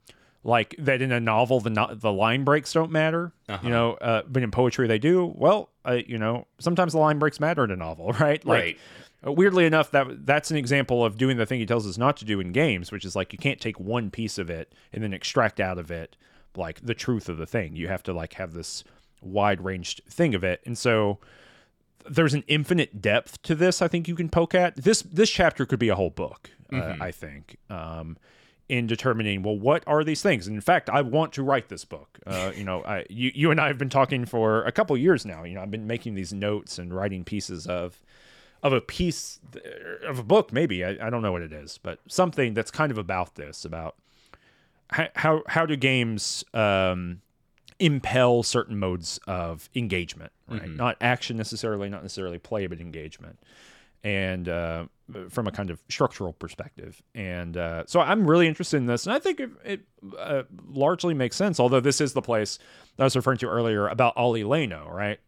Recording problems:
none

